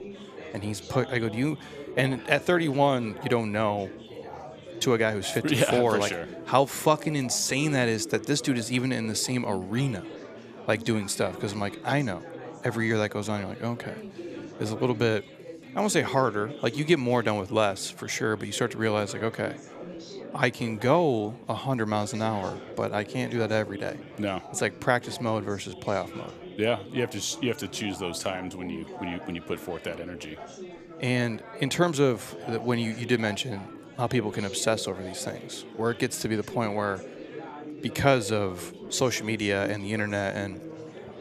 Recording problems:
chatter from many people; noticeable; throughout; 15 dB below the speech

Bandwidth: 14.5 kHz